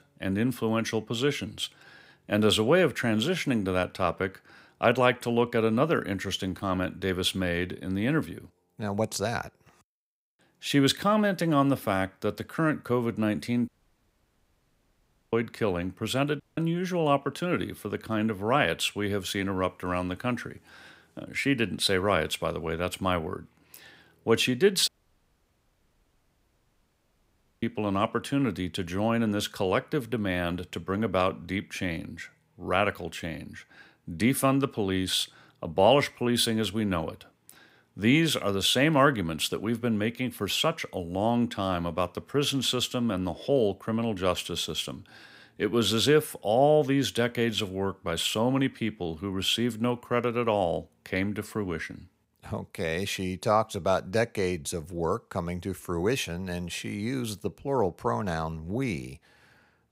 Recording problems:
audio cutting out; at 14 s for 1.5 s, at 16 s and at 25 s for 2.5 s

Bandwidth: 15.5 kHz